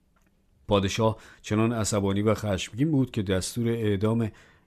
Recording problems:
none

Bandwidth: 14 kHz